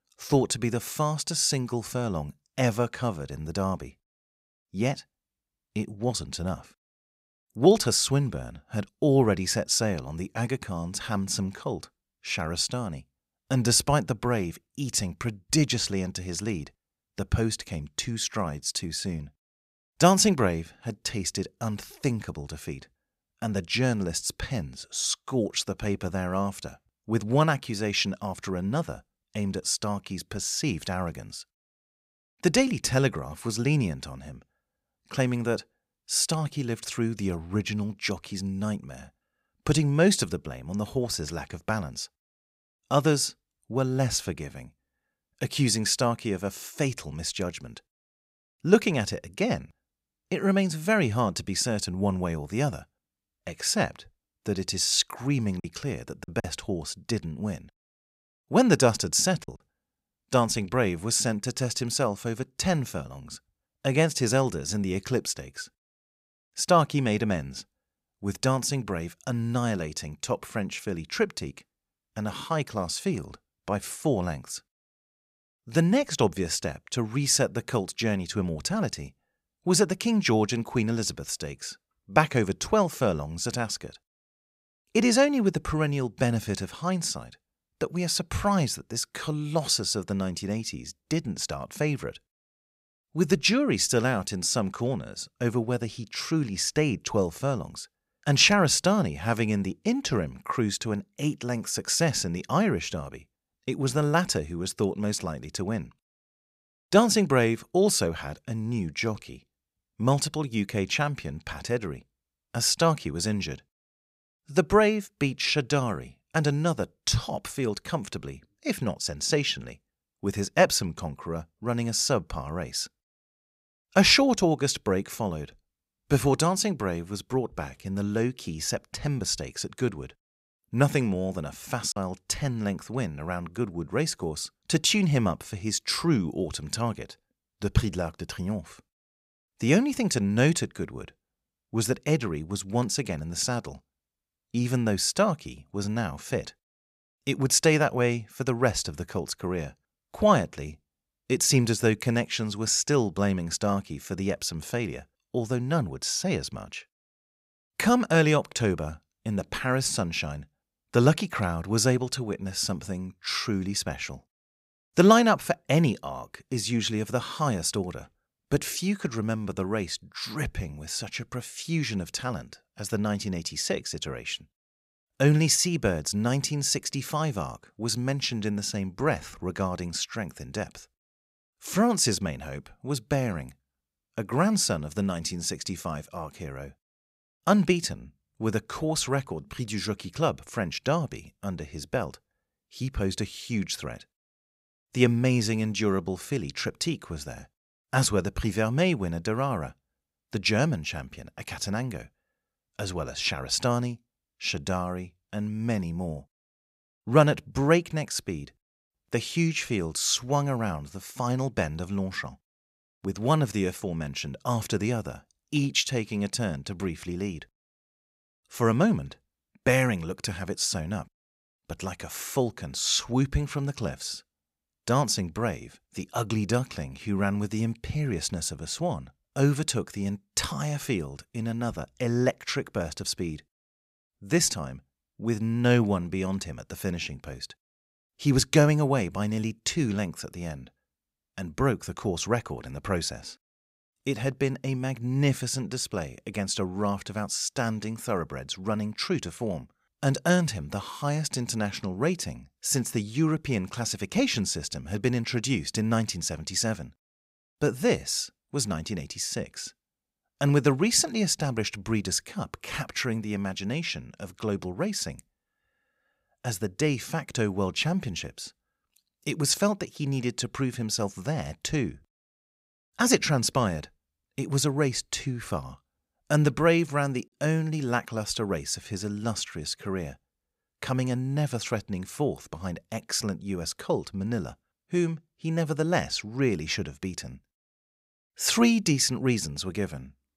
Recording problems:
choppy; occasionally; from 56 s to 1:00 and at 2:12; 3% of the speech affected

